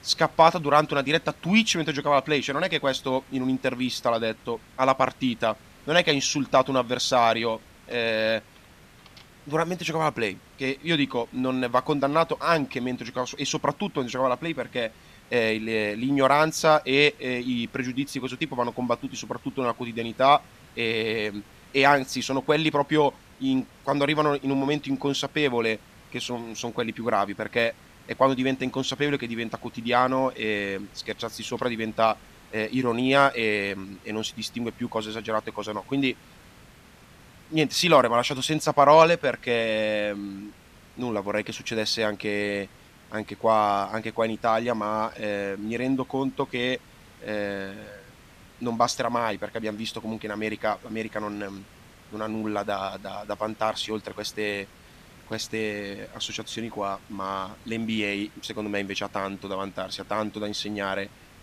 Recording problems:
hiss; faint; throughout; 25 dB below the speech

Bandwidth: 14.5 kHz